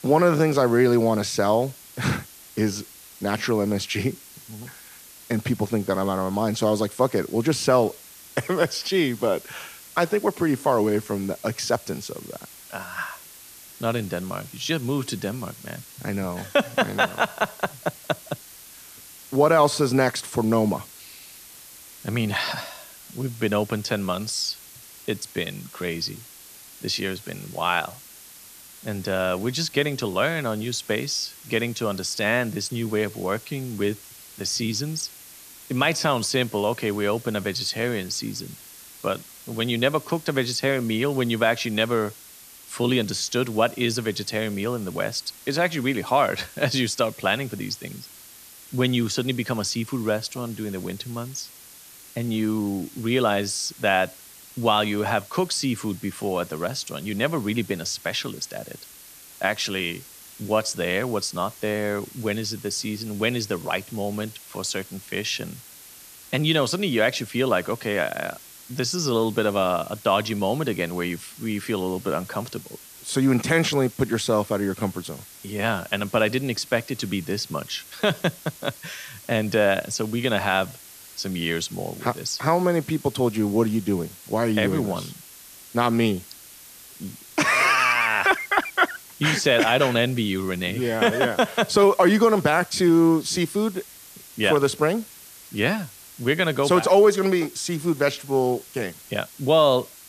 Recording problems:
hiss; noticeable; throughout; 20 dB below the speech

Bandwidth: 14.5 kHz